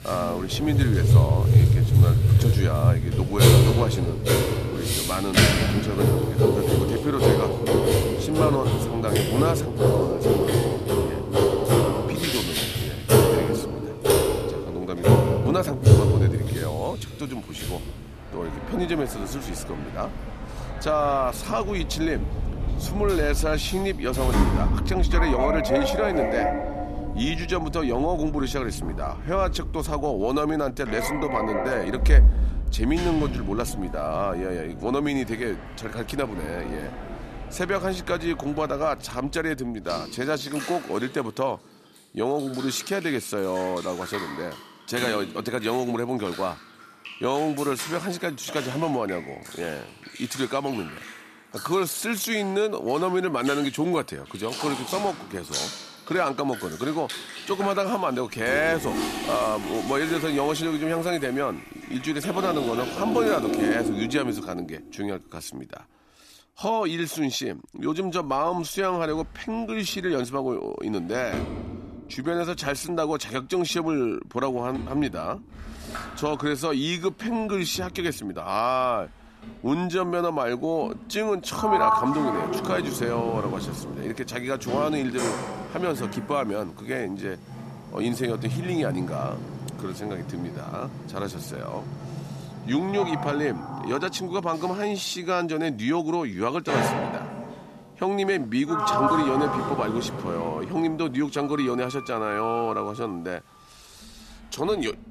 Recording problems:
household noises; very loud; throughout; 3 dB above the speech

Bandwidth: 14 kHz